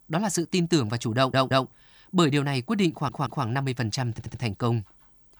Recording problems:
audio stuttering; at 1 s, at 3 s and at 4 s

